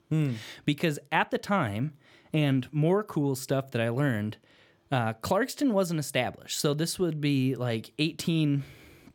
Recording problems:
none

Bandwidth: 17.5 kHz